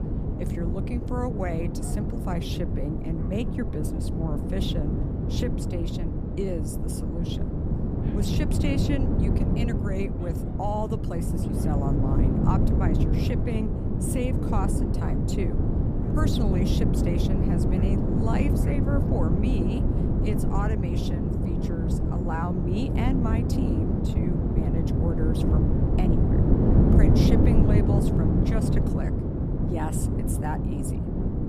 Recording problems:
wind noise on the microphone; heavy; 2 dB above the speech
animal sounds; faint; throughout; 25 dB below the speech

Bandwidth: 15 kHz